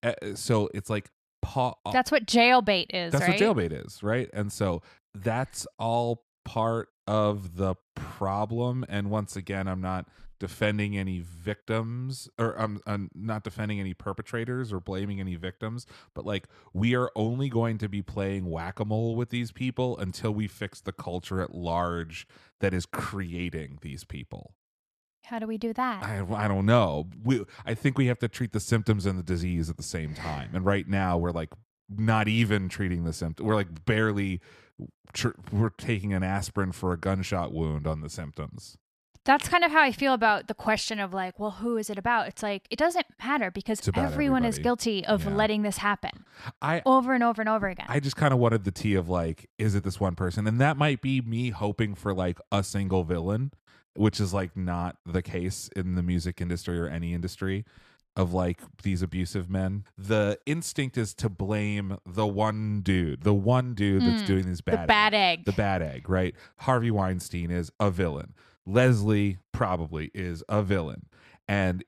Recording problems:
none

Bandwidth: 14 kHz